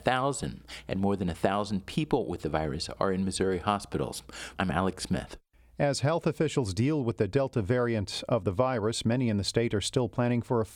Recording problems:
squashed, flat; somewhat

